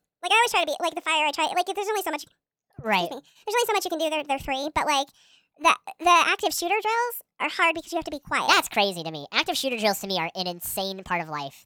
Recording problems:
wrong speed and pitch; too fast and too high; 1.5 times normal speed

